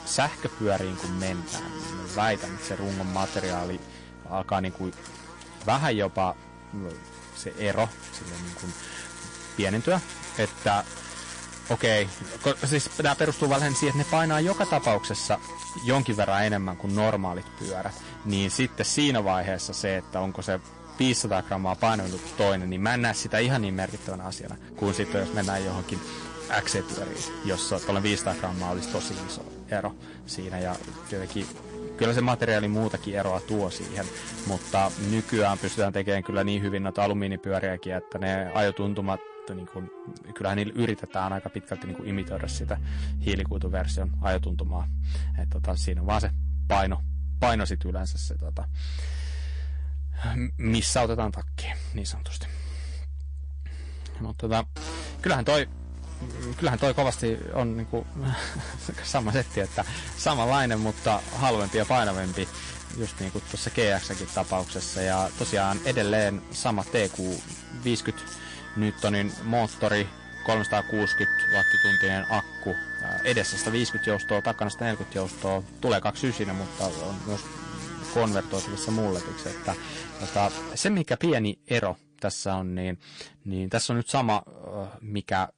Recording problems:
distortion; slight; 4% of the sound clipped
garbled, watery; slightly; nothing above 9 kHz
background music; loud; throughout; 5 dB below the speech
electrical hum; noticeable; until 36 s and from 55 s to 1:21; 60 Hz, 10 dB below the speech

